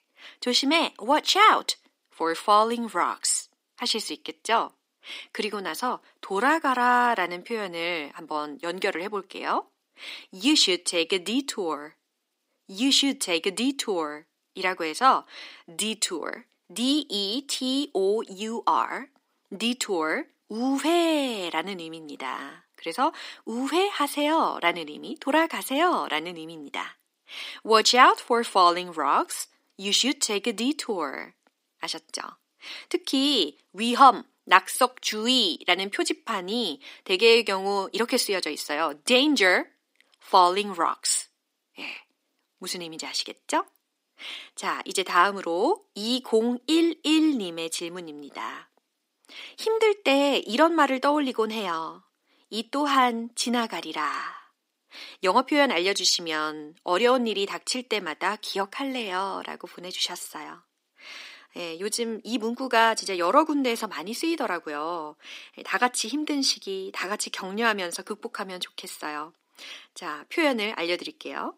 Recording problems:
thin; somewhat; fading below 300 Hz

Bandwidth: 15.5 kHz